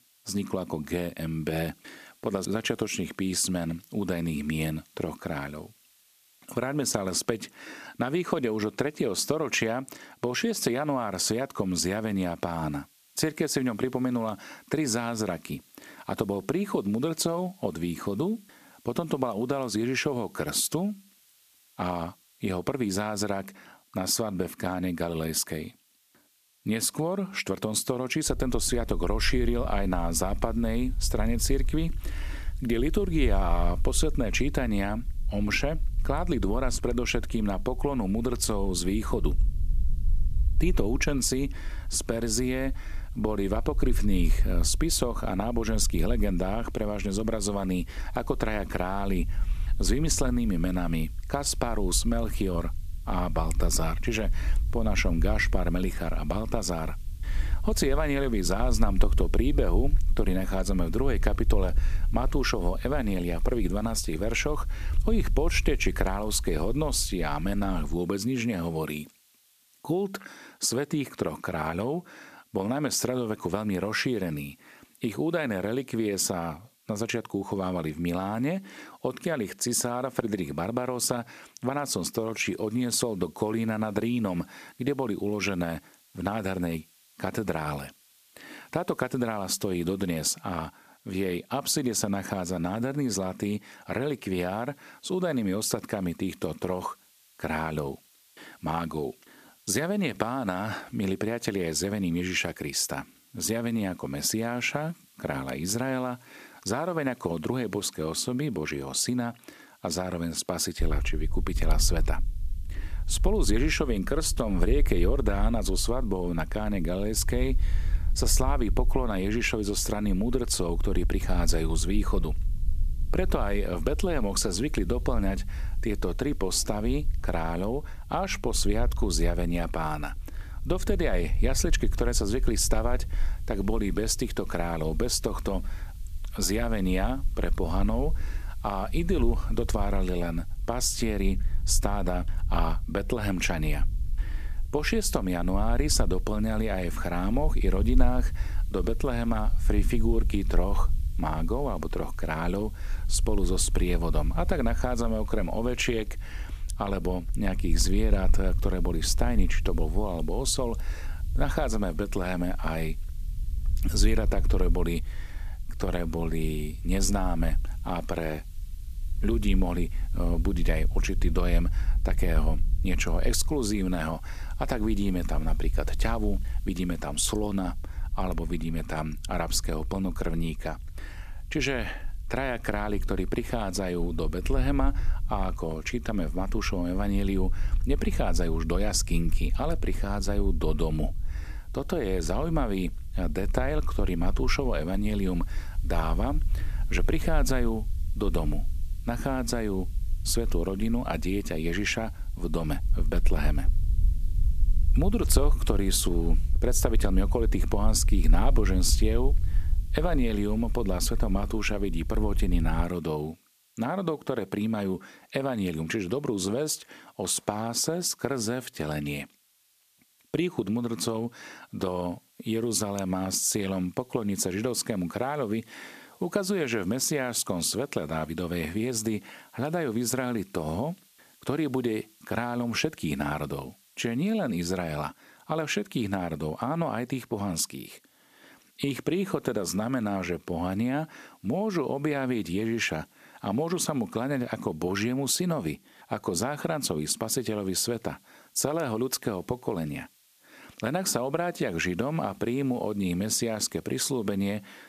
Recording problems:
hiss; faint; throughout; 30 dB below the speech
low rumble; faint; from 28 s to 1:08 and from 1:51 to 3:33; 25 dB below the speech

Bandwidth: 14.5 kHz